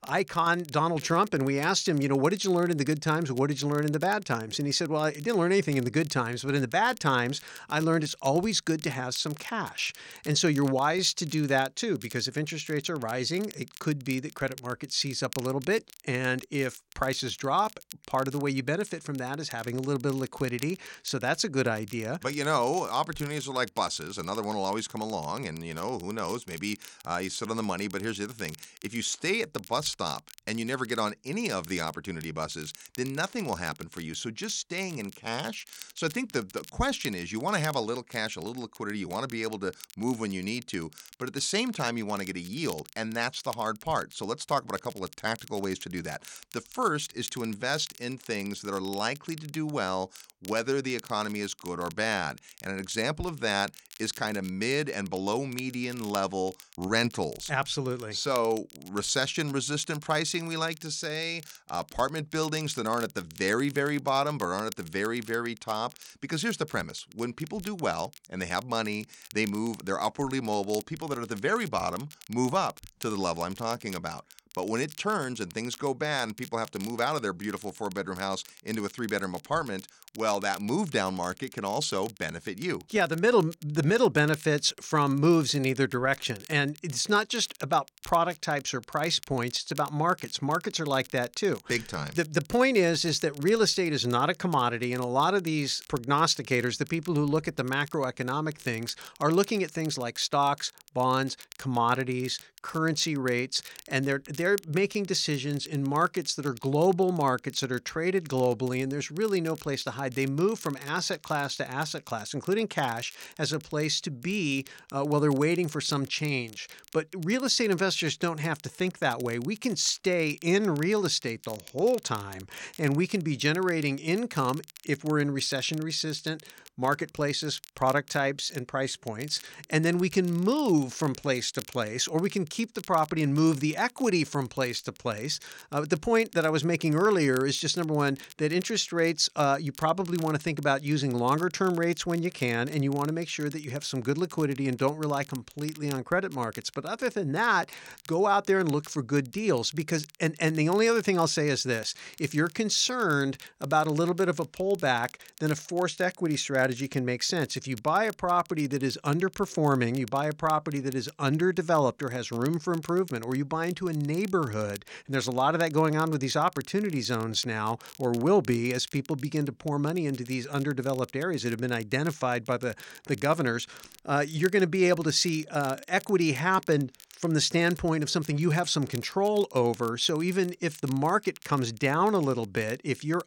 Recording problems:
crackle, like an old record; faint; 20 dB below the speech

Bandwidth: 16.5 kHz